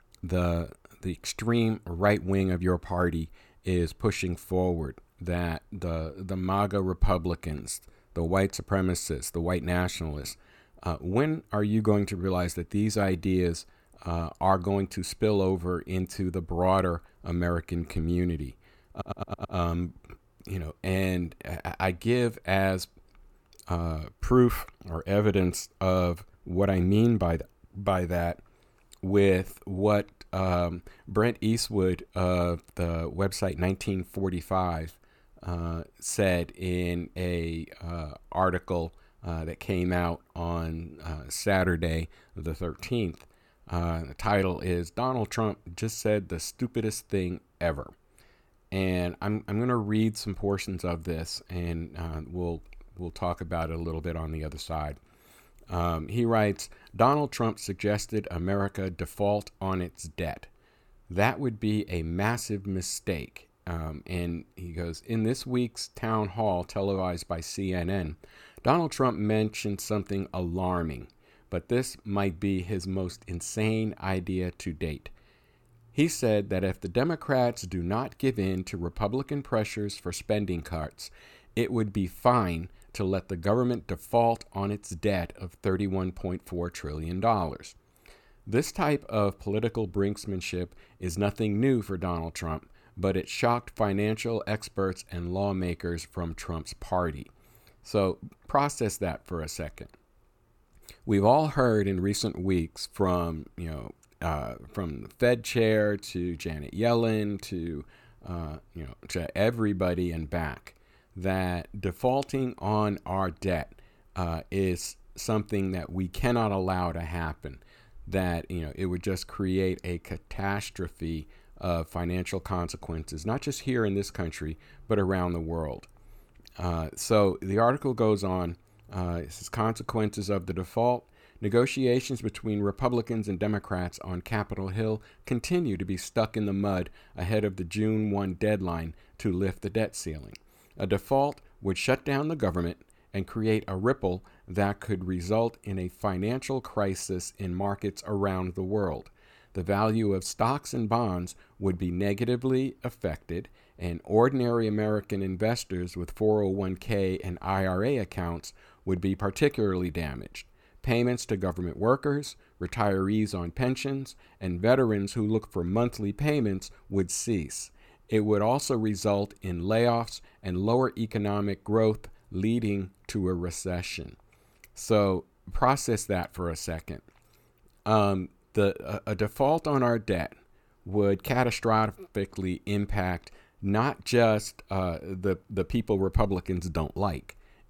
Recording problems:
audio stuttering; at 19 s

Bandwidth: 17 kHz